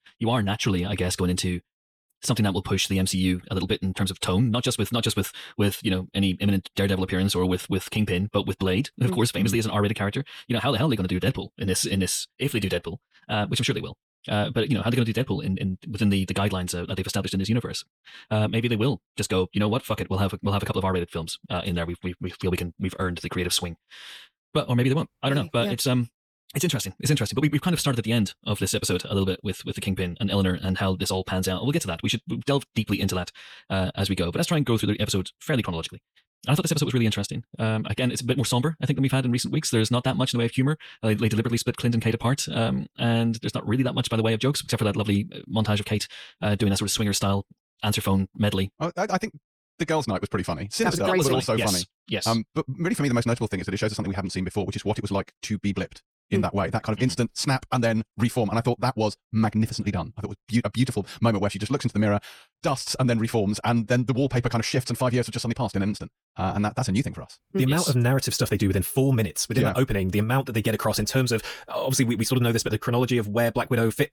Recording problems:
wrong speed, natural pitch; too fast; 1.6 times normal speed

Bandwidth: 18.5 kHz